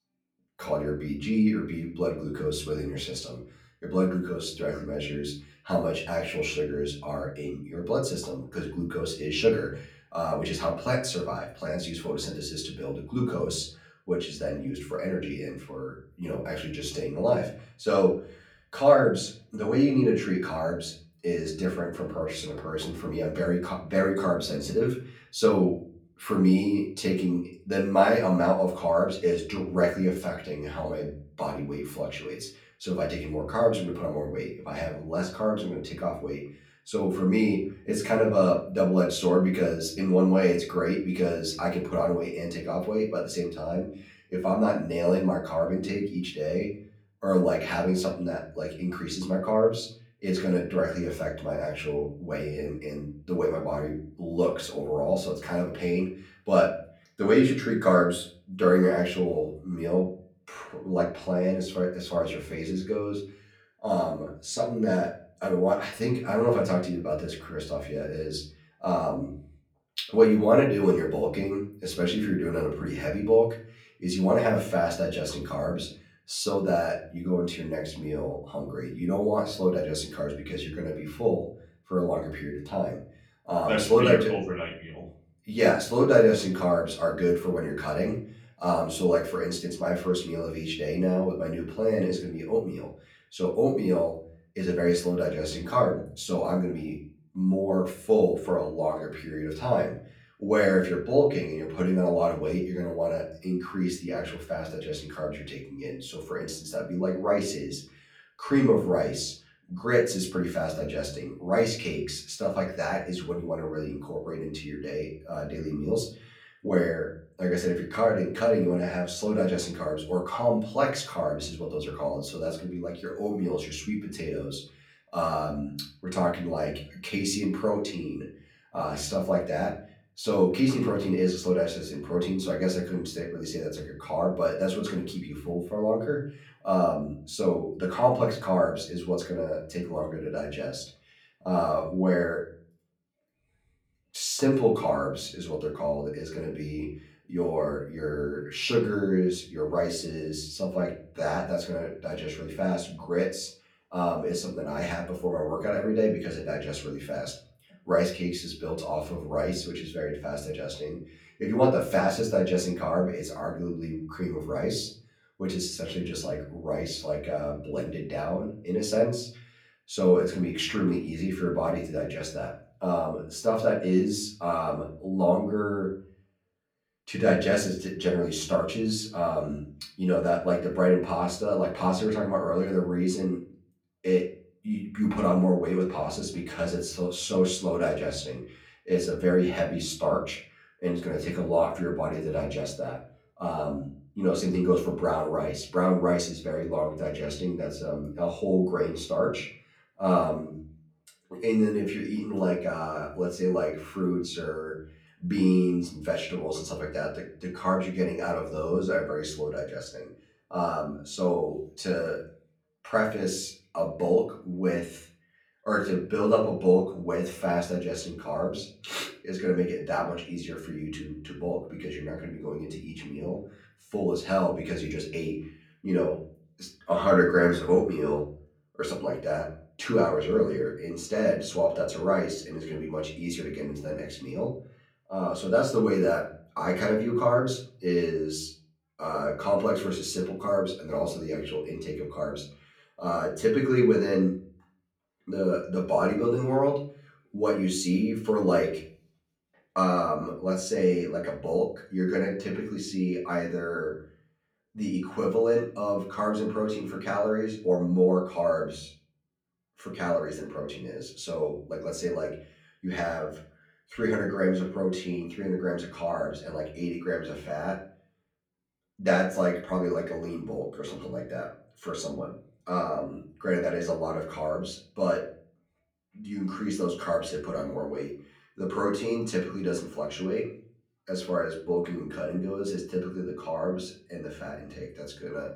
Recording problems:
off-mic speech; far
room echo; slight; dies away in 0.4 s

